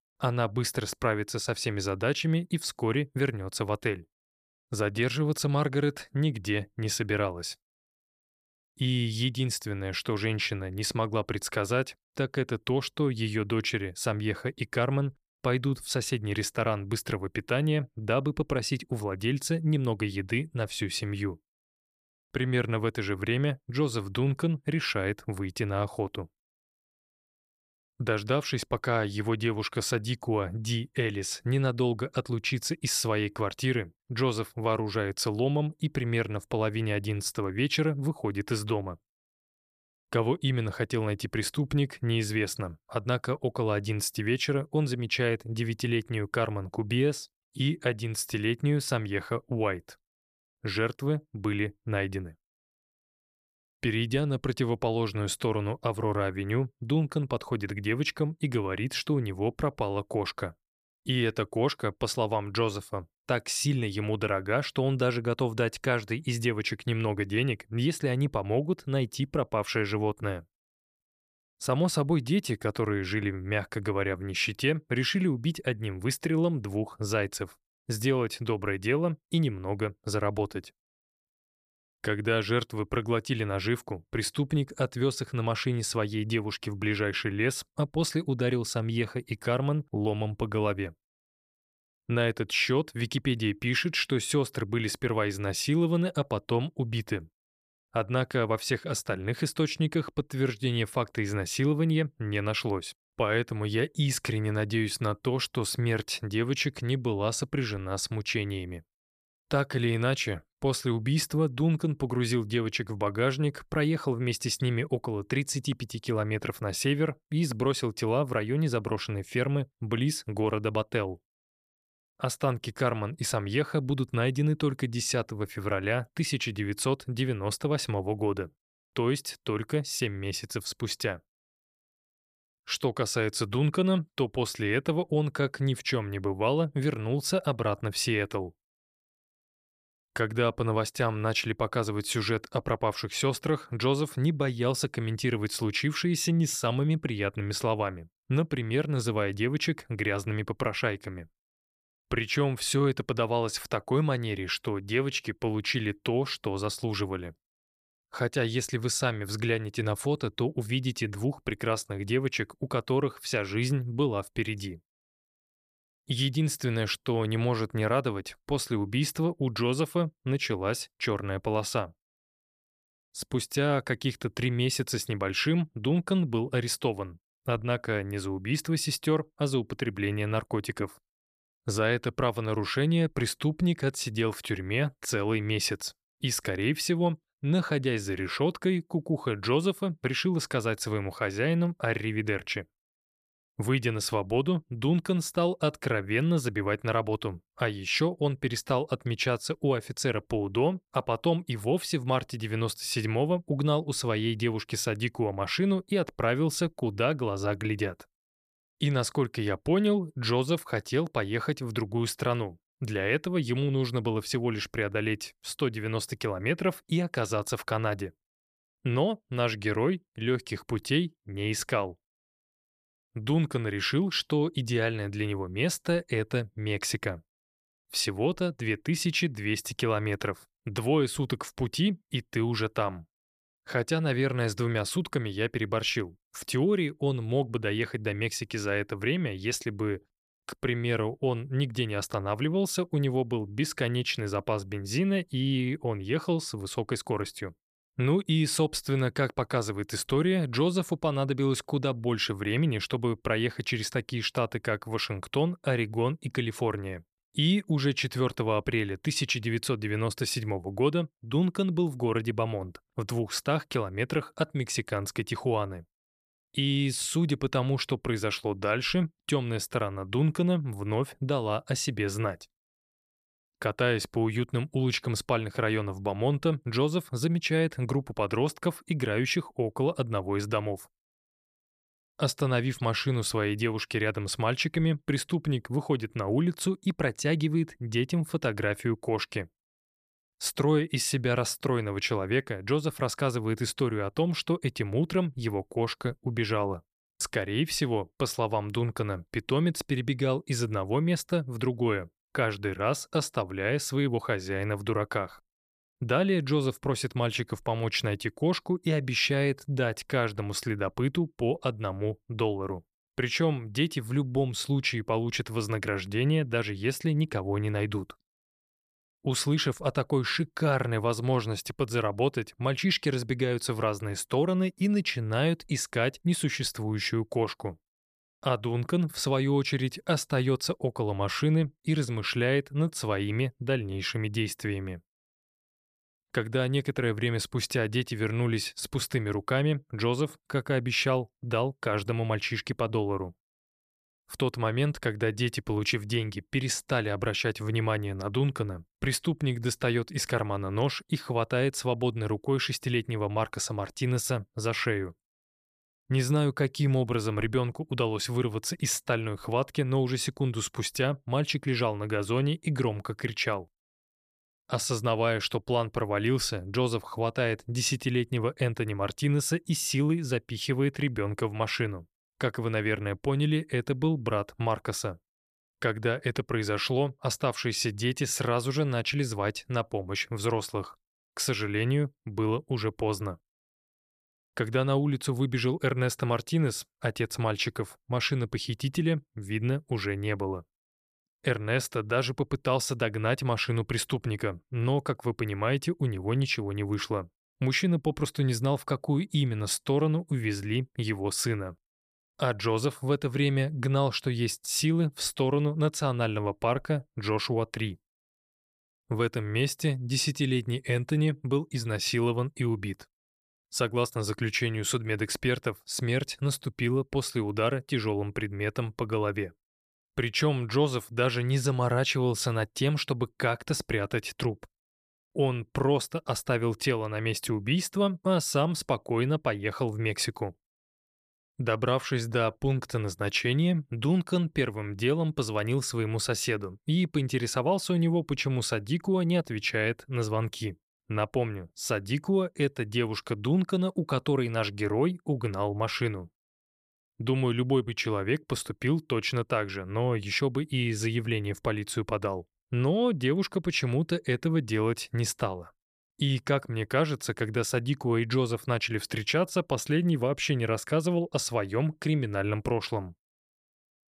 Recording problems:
none

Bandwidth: 14.5 kHz